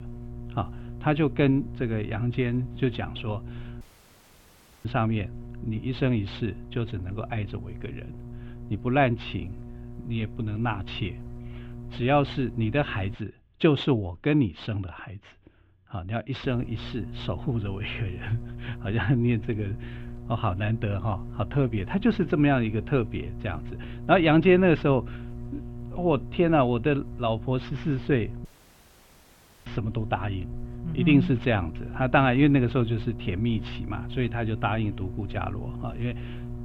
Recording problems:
muffled; very; fading above 3 kHz
electrical hum; noticeable; until 13 s and from 16 s on; 60 Hz, 20 dB below the speech
audio cutting out; at 4 s for 1 s and at 28 s for 1 s

